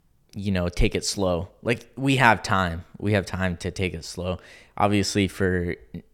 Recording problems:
none

